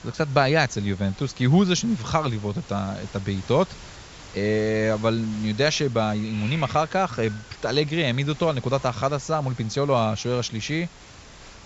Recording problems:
high frequencies cut off; noticeable; nothing above 7.5 kHz
hiss; noticeable; throughout; 20 dB below the speech

